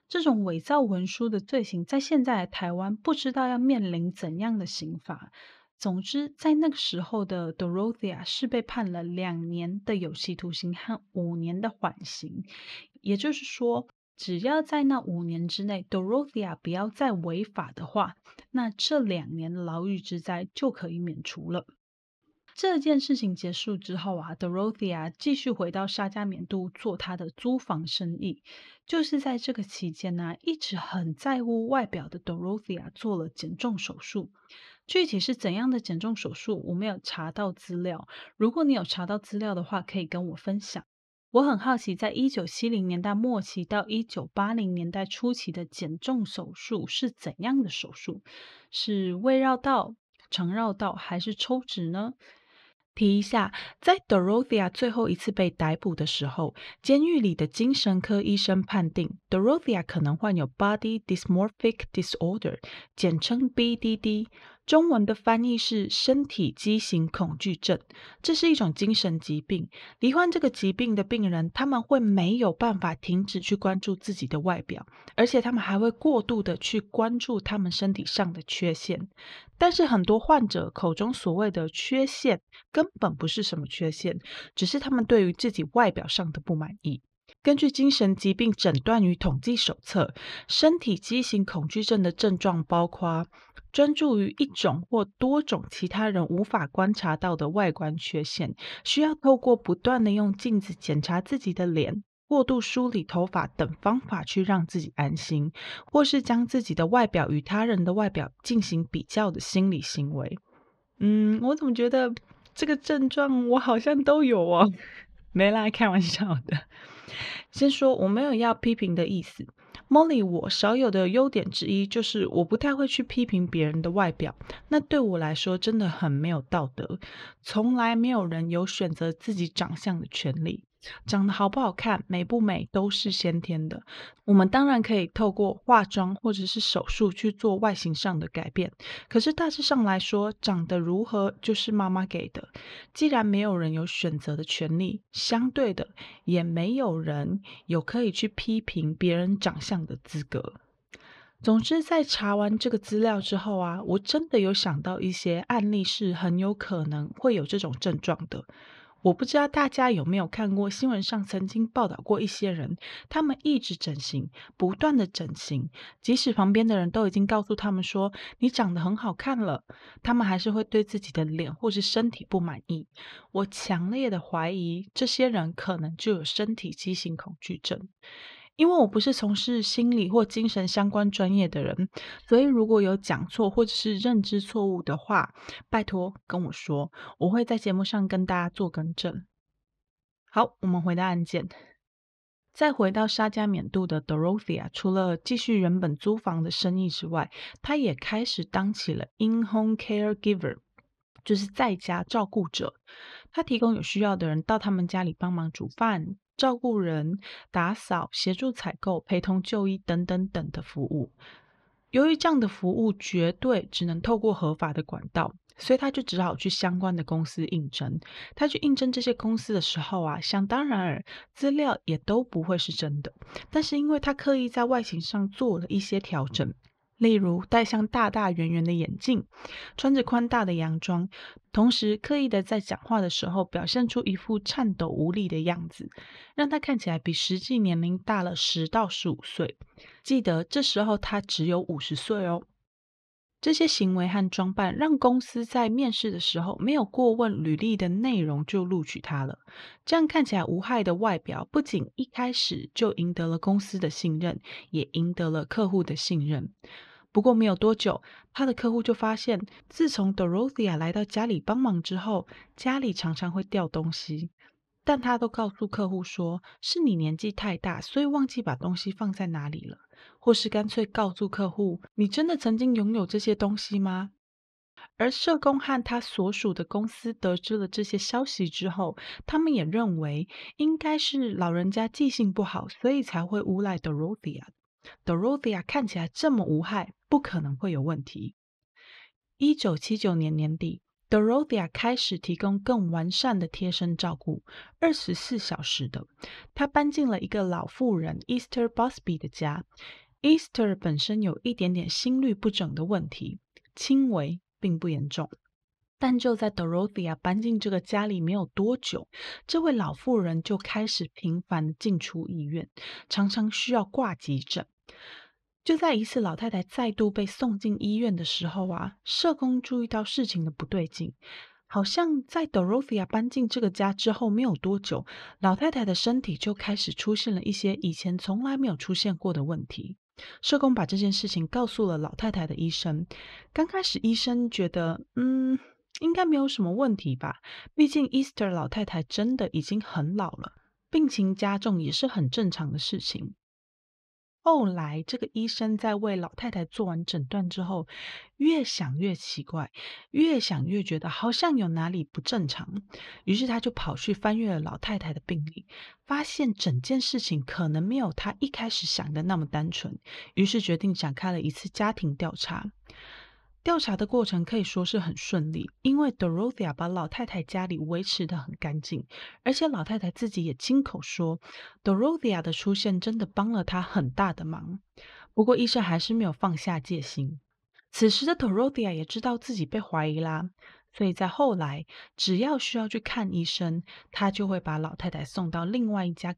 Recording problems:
muffled; very slightly; fading above 4 kHz

